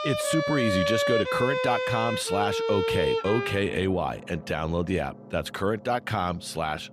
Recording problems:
background music; very loud; throughout; as loud as the speech

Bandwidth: 15.5 kHz